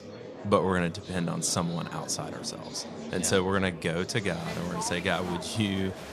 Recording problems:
murmuring crowd; noticeable; throughout; 10 dB below the speech

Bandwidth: 14.5 kHz